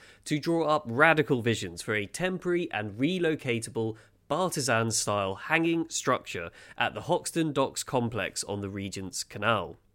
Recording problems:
none

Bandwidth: 16 kHz